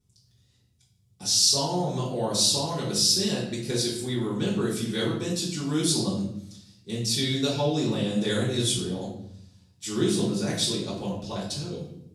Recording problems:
off-mic speech; far
room echo; noticeable; dies away in 0.7 s

